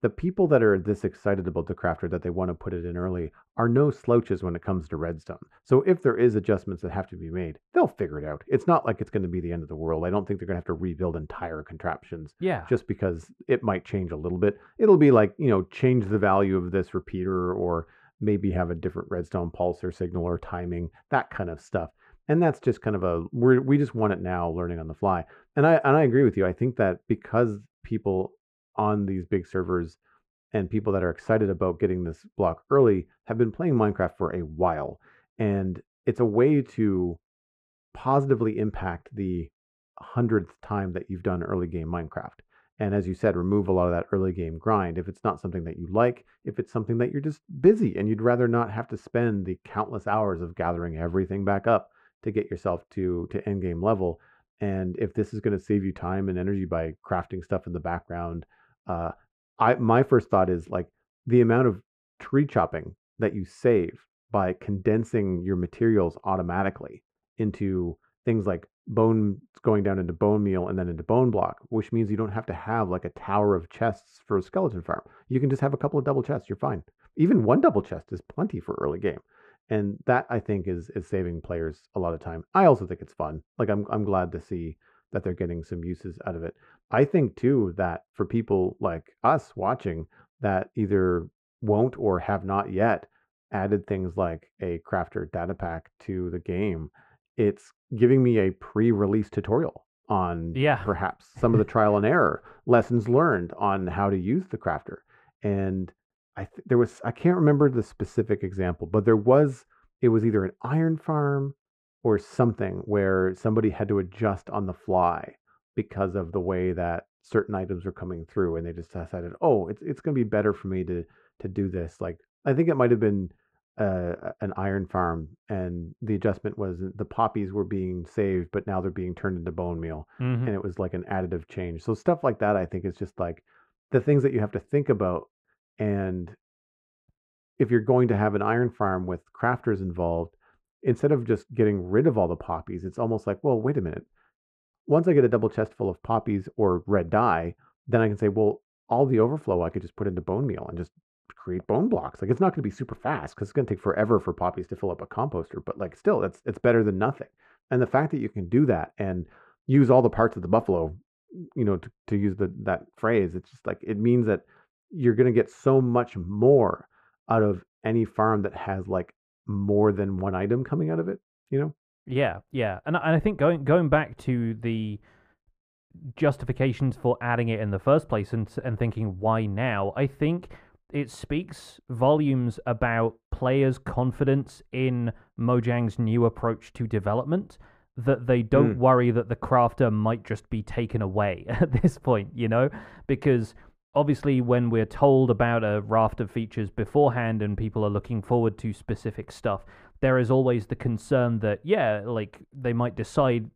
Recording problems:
muffled; very; fading above 2 kHz

